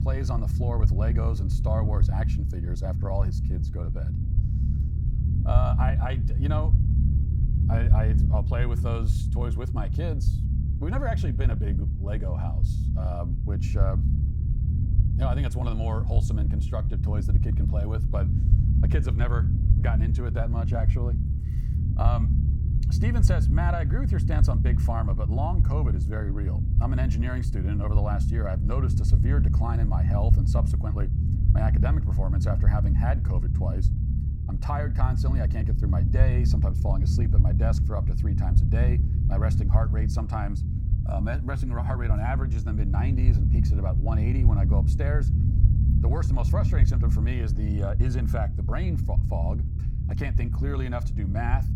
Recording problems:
low rumble; loud; throughout; 4 dB below the speech

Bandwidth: 17.5 kHz